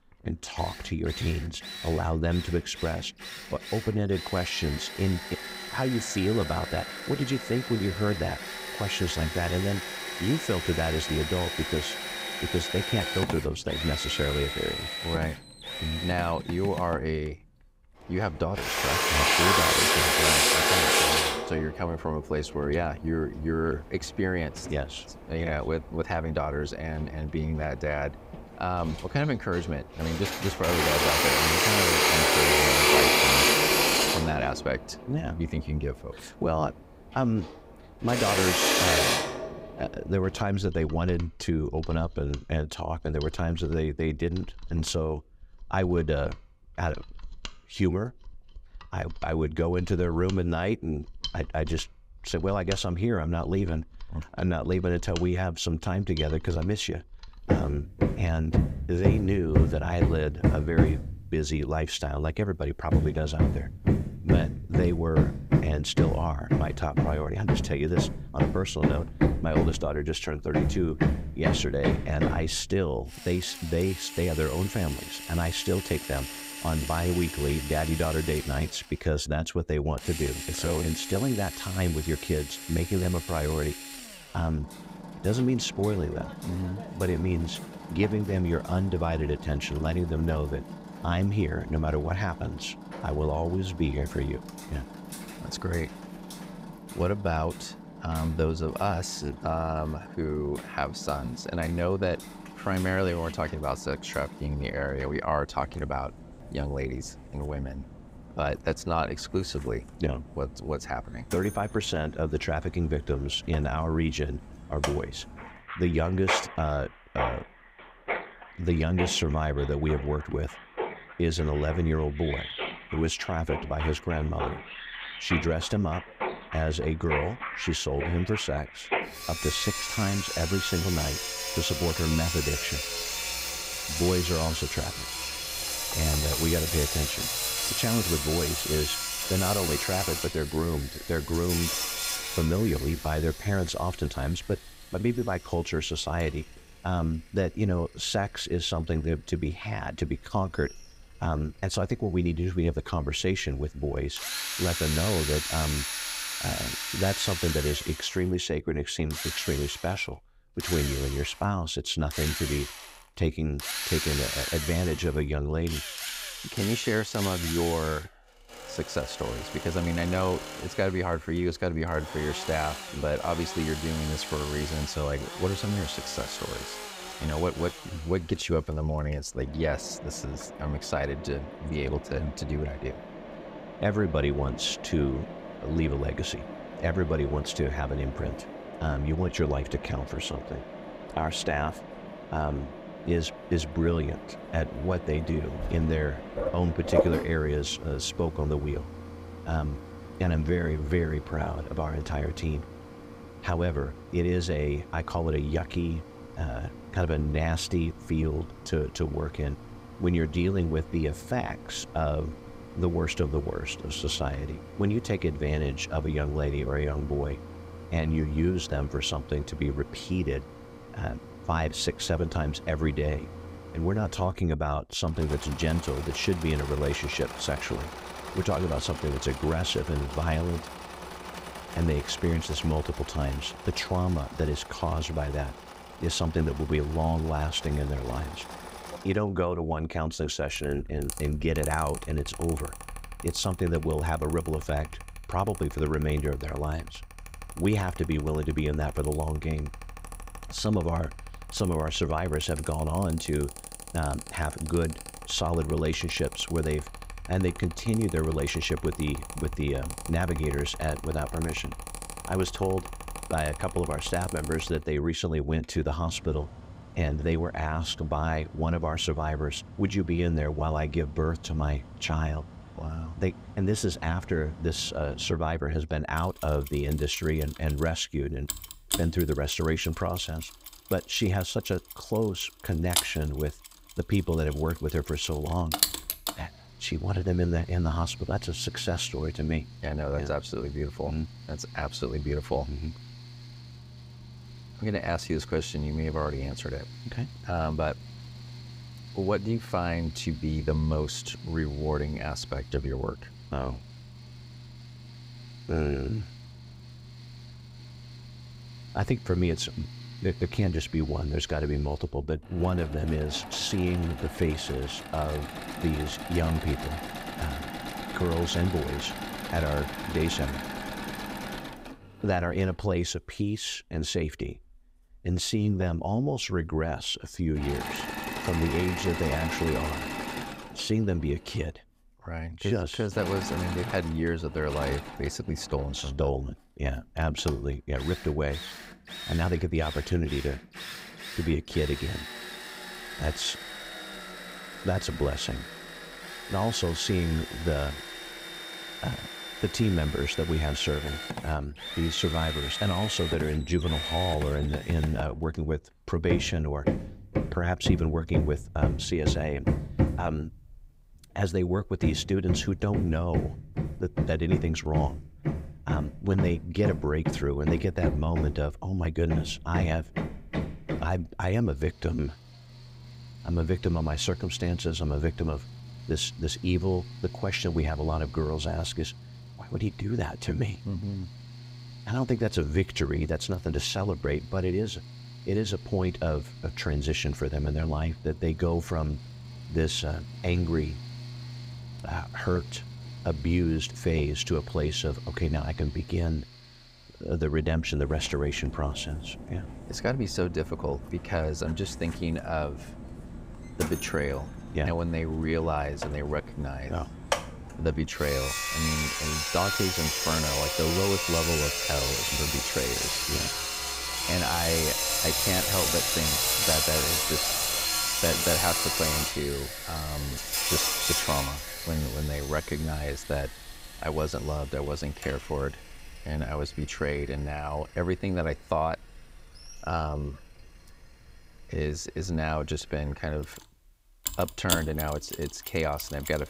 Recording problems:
machinery noise; loud; throughout; 2 dB below the speech

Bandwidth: 15.5 kHz